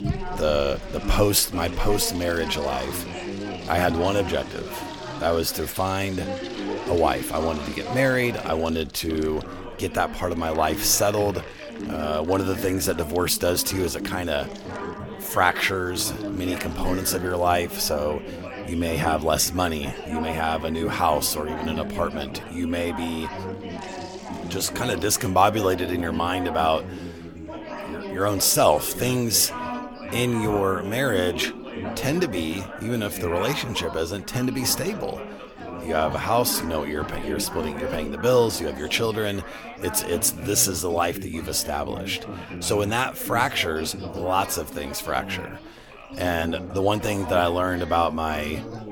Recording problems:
chatter from many people; loud; throughout; 10 dB below the speech
household noises; faint; throughout; 20 dB below the speech

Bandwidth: 18 kHz